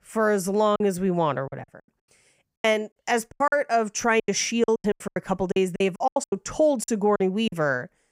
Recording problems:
choppy; very; 17% of the speech affected

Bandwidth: 15.5 kHz